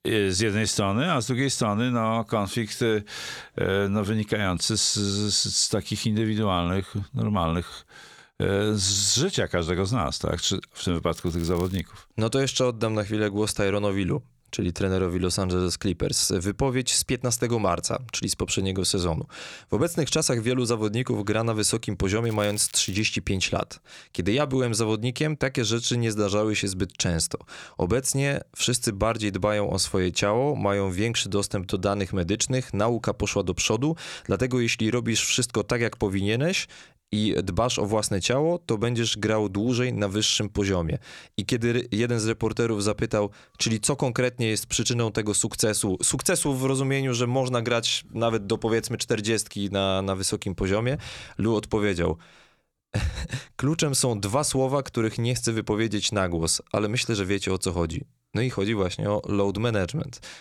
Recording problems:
crackling; faint; at 11 s and at 22 s; 20 dB below the speech

